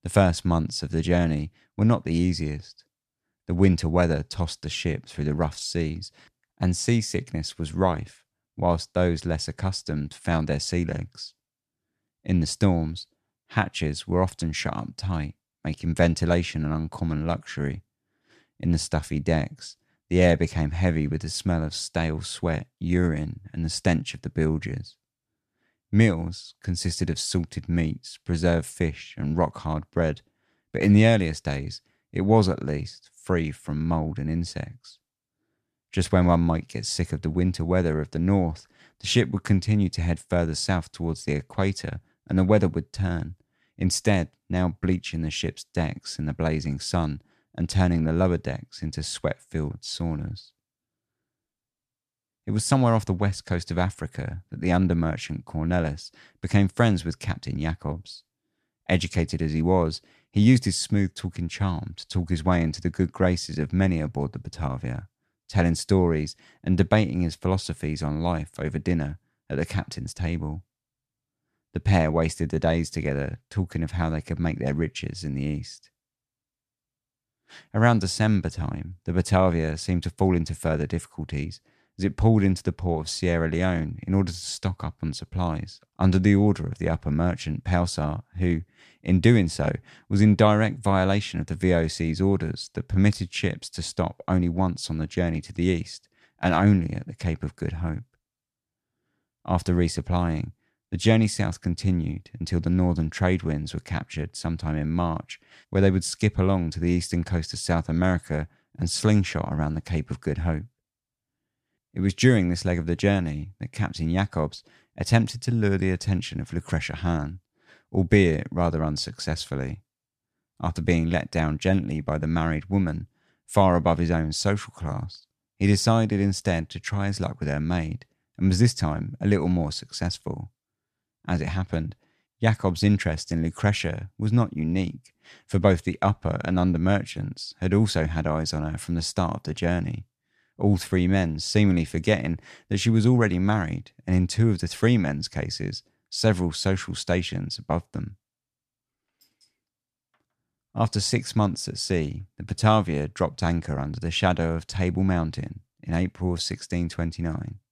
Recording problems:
none

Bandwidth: 14 kHz